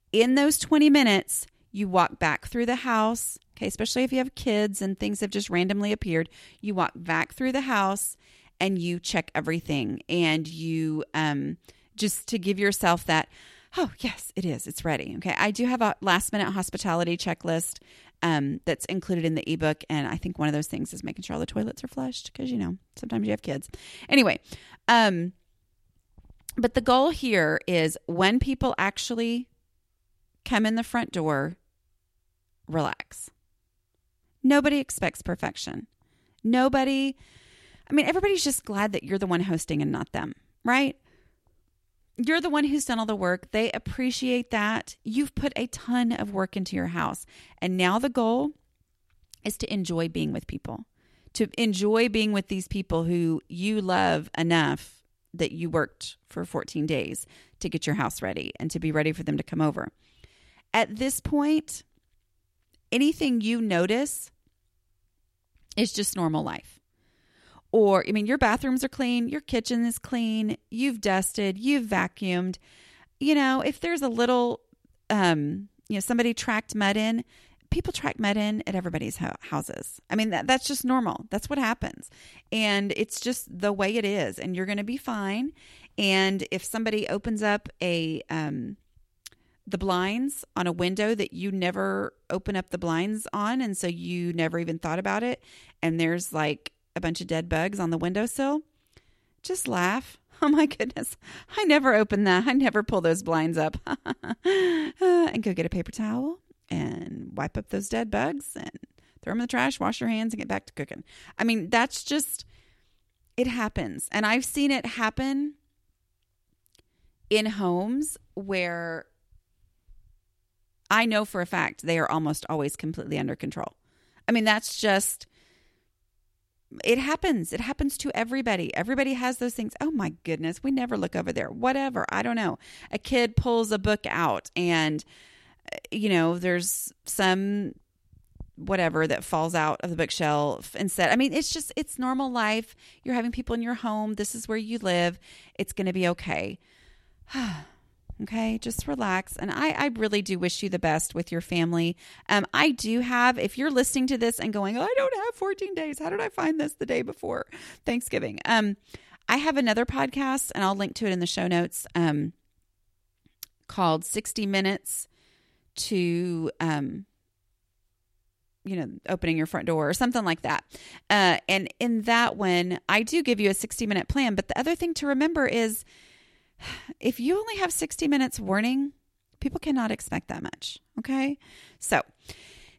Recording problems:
none

